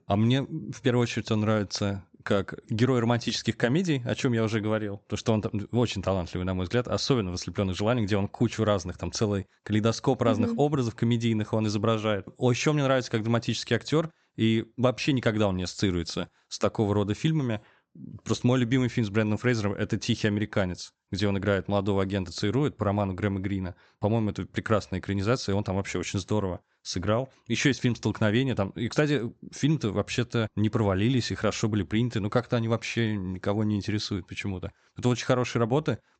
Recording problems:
high frequencies cut off; noticeable; nothing above 8 kHz

